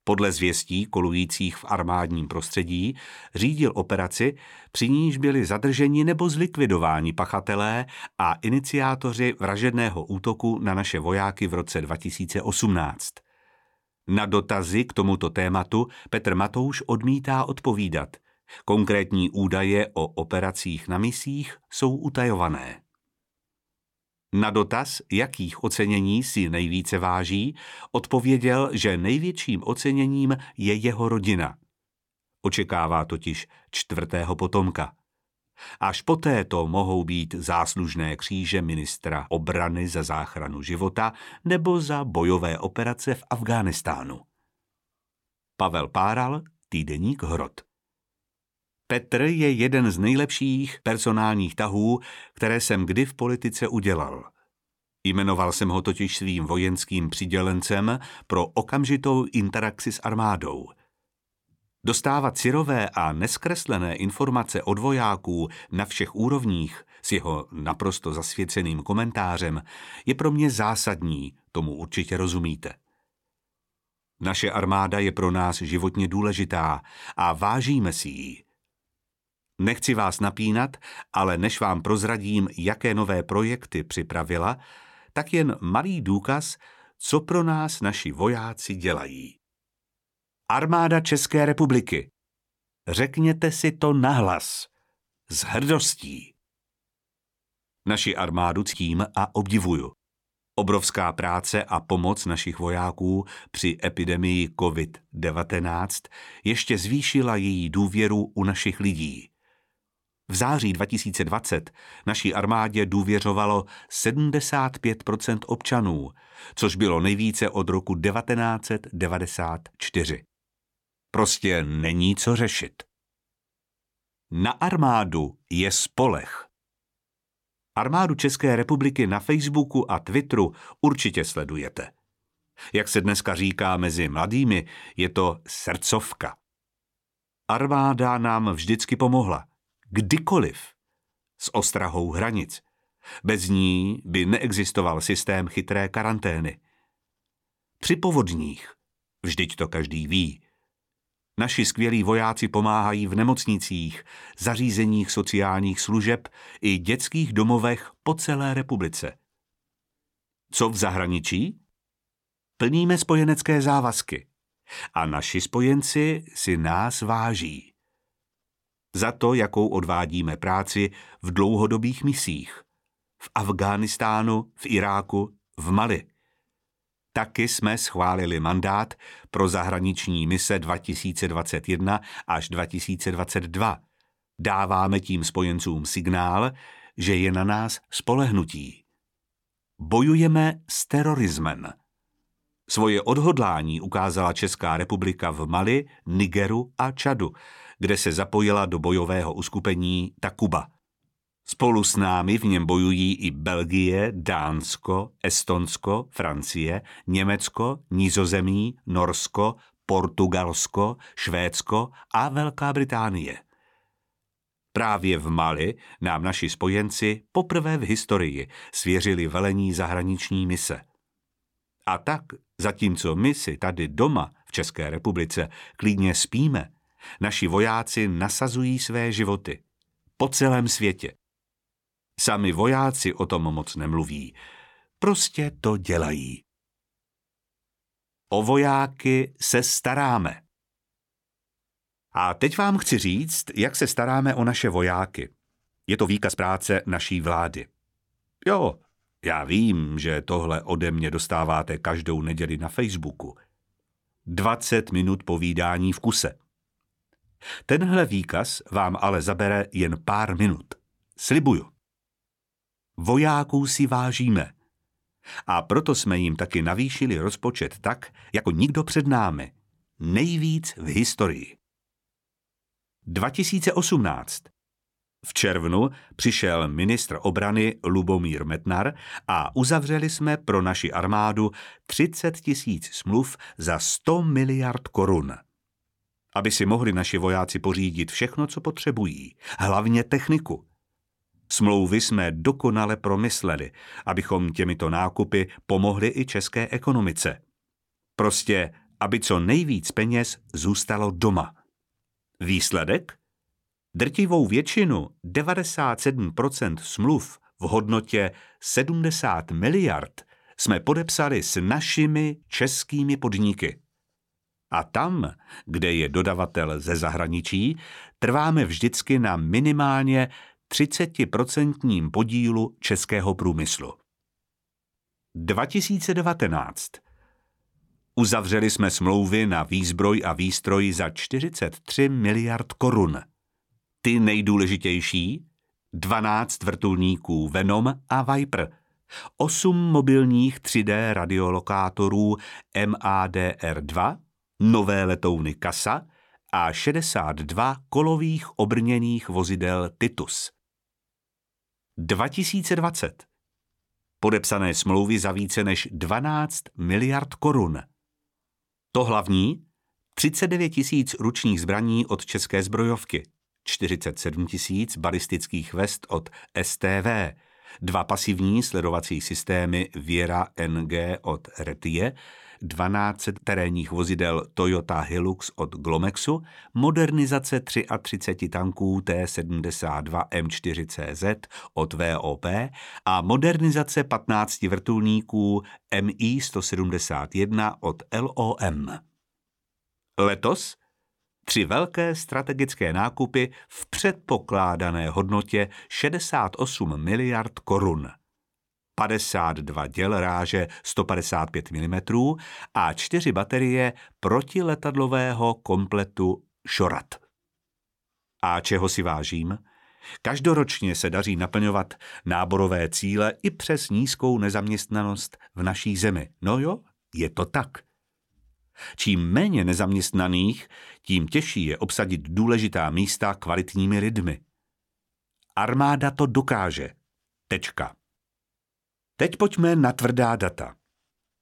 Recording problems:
uneven, jittery; strongly; from 1:45 to 6:35

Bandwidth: 17 kHz